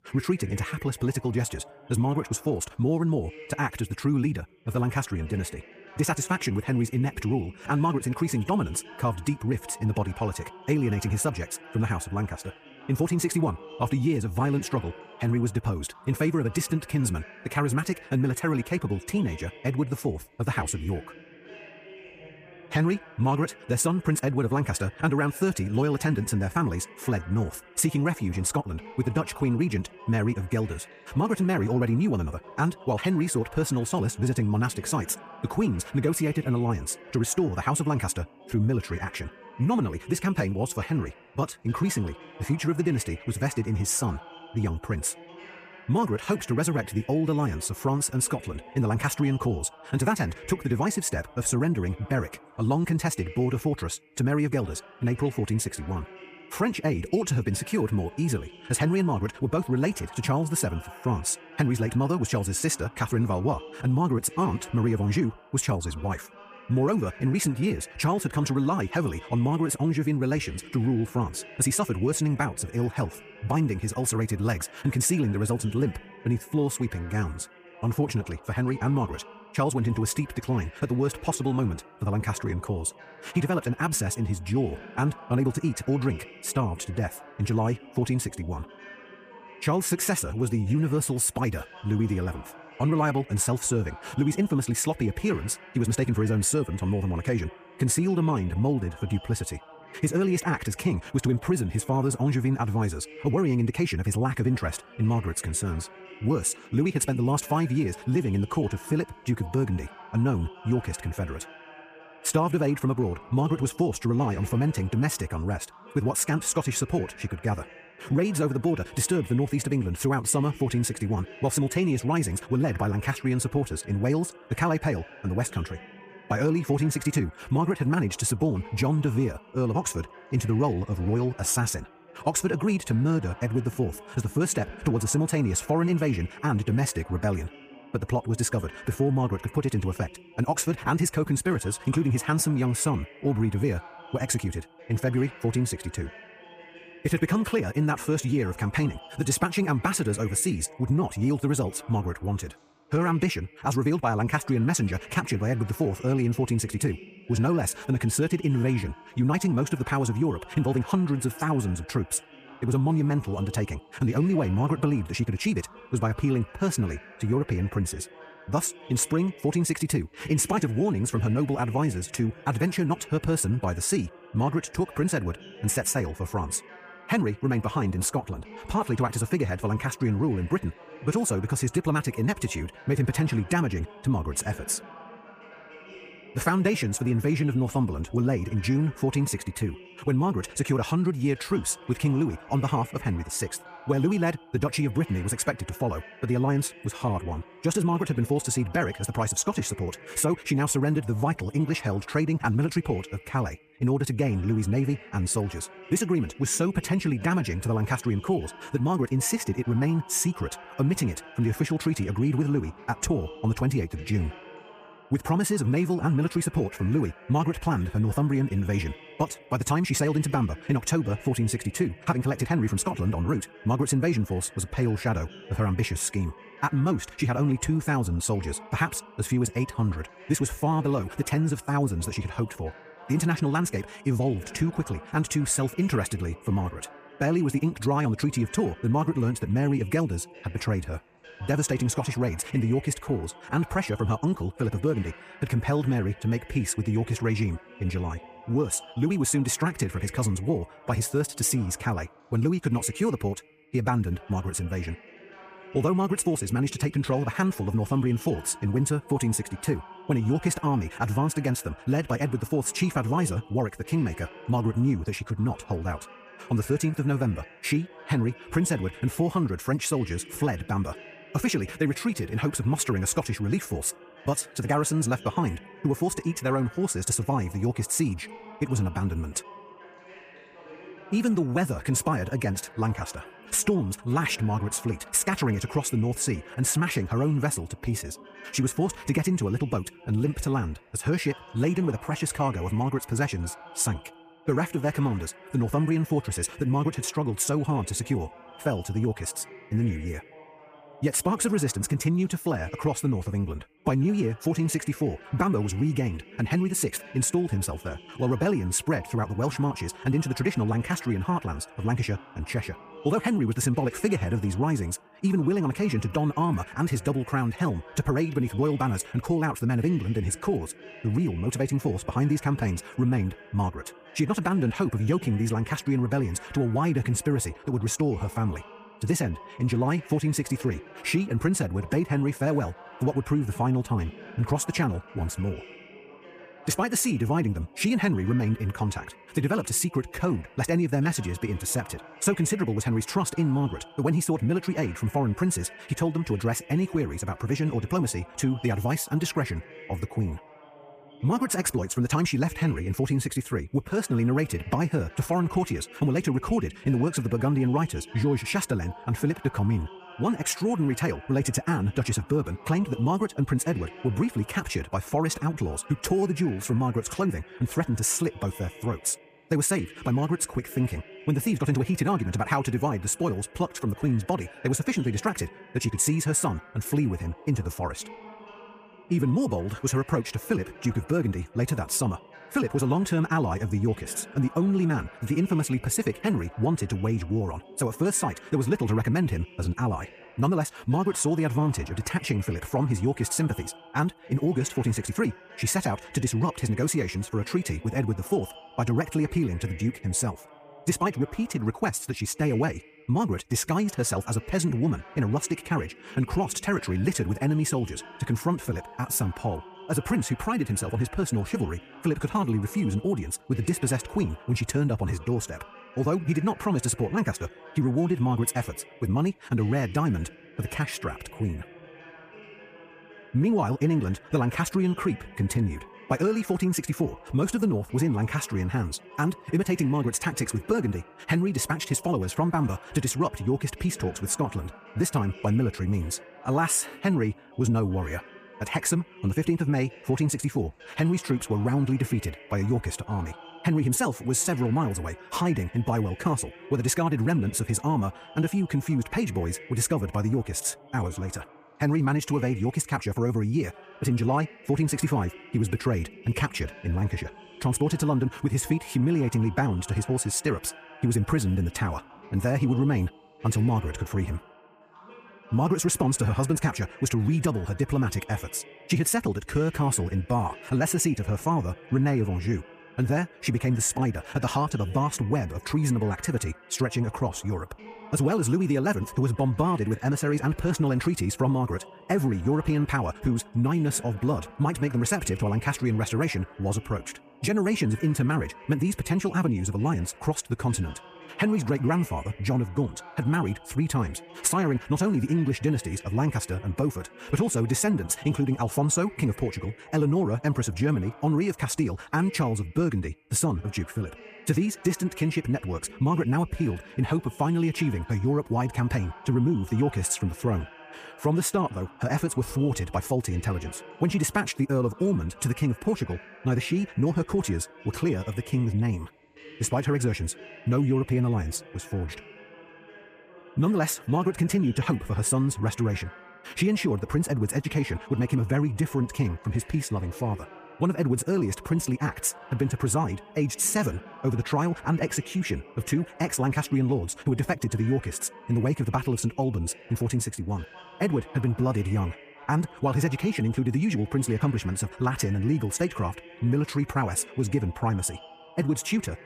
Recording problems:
wrong speed, natural pitch; too fast; 1.5 times normal speed
voice in the background; noticeable; throughout; 20 dB below the speech

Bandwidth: 15 kHz